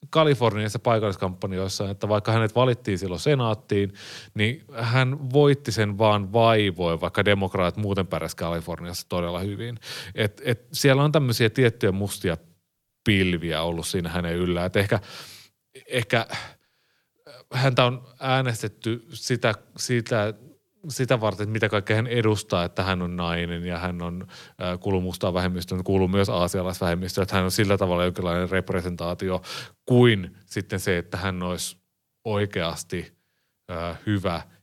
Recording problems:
none

